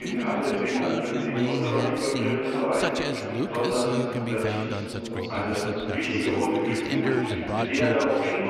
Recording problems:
chatter from many people; very loud; throughout; 5 dB above the speech

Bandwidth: 13.5 kHz